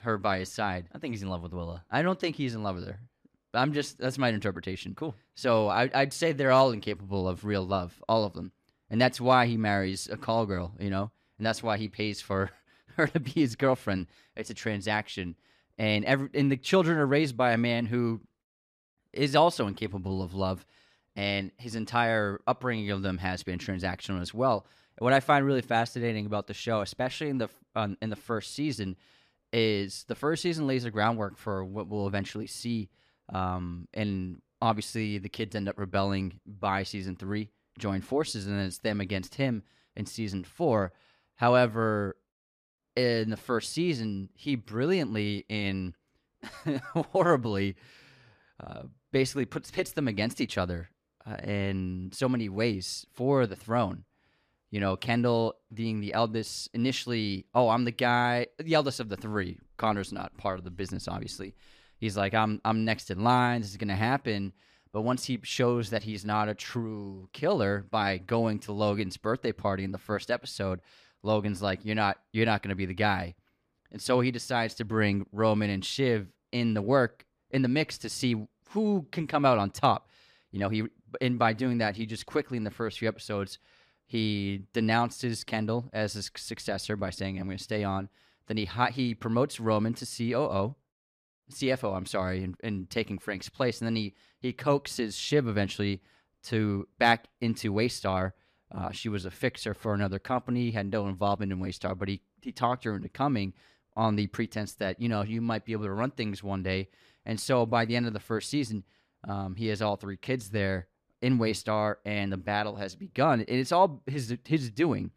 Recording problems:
none

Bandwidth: 14.5 kHz